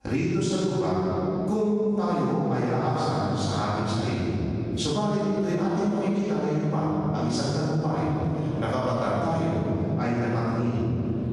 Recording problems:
room echo; strong; dies away in 2.6 s
off-mic speech; far
squashed, flat; somewhat

